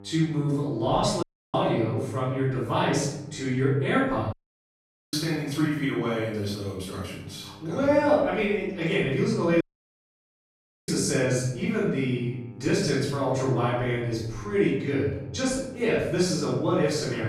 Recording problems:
room echo; strong; dies away in 0.8 s
off-mic speech; far
electrical hum; faint; throughout; 50 Hz, 25 dB below the speech
audio cutting out; at 1 s, at 4.5 s for 1 s and at 9.5 s for 1.5 s
abrupt cut into speech; at the end

